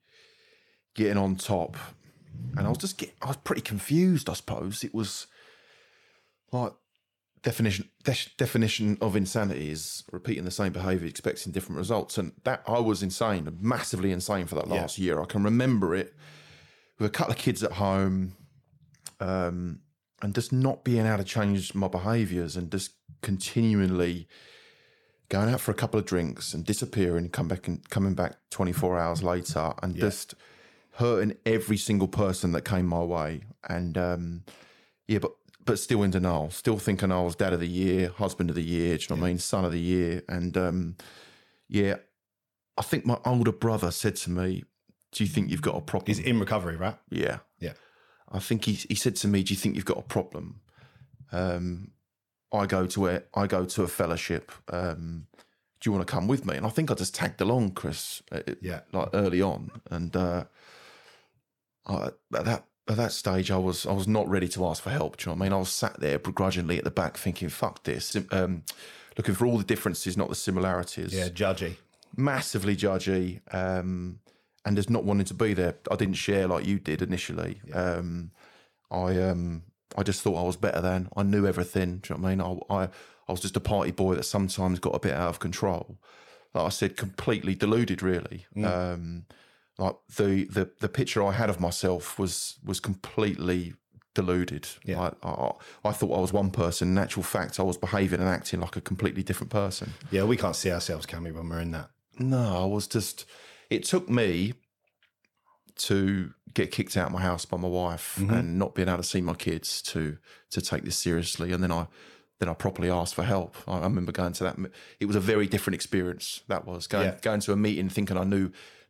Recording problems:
none

